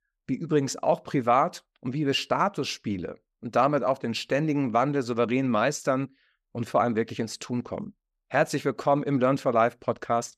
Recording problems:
none

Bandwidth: 14.5 kHz